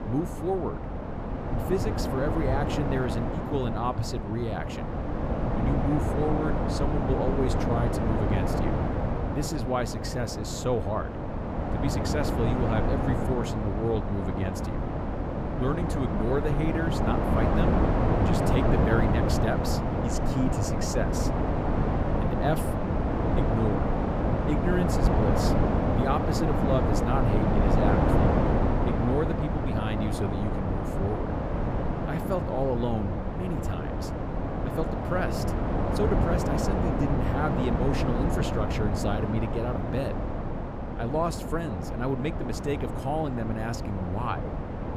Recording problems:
wind noise on the microphone; heavy; 2 dB above the speech

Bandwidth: 15.5 kHz